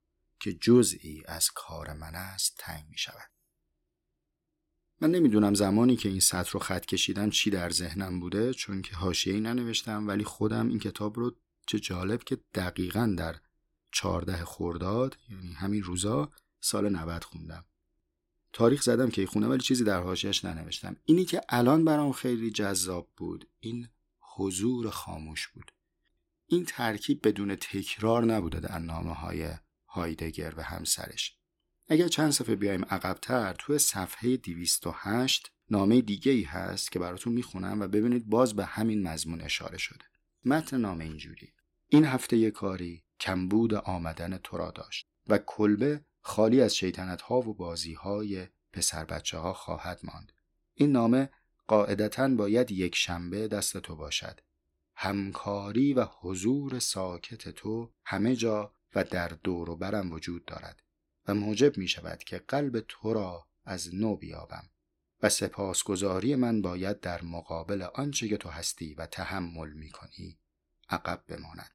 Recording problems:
none

